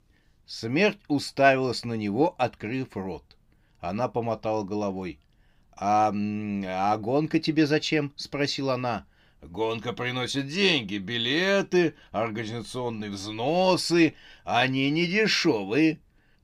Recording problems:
none

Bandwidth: 15.5 kHz